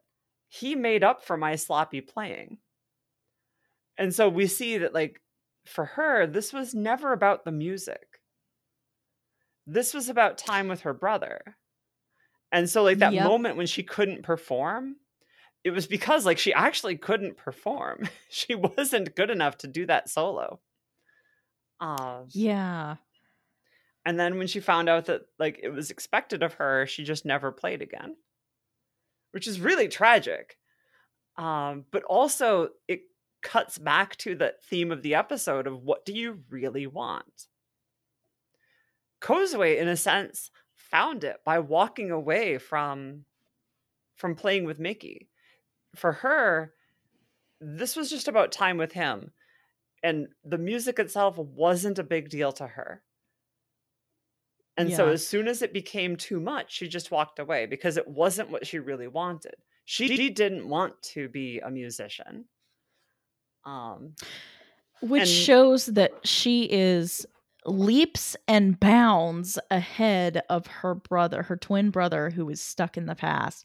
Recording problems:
audio stuttering; at 1:00

